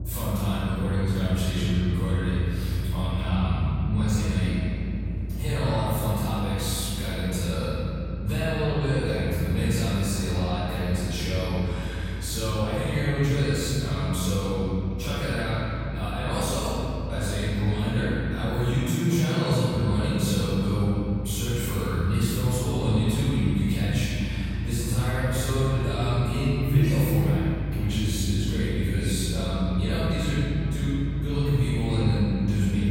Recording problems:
room echo; strong; dies away in 3 s
off-mic speech; far
low rumble; noticeable; throughout; 15 dB below the speech

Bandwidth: 16 kHz